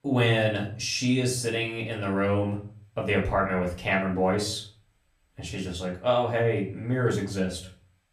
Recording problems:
off-mic speech; far
room echo; slight; dies away in 0.4 s

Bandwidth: 14.5 kHz